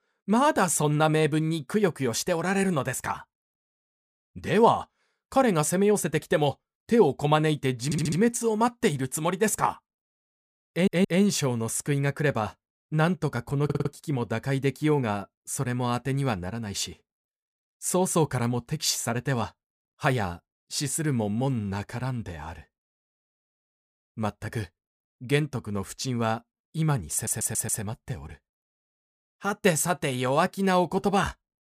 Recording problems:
audio stuttering; 4 times, first at 8 s

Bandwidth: 15 kHz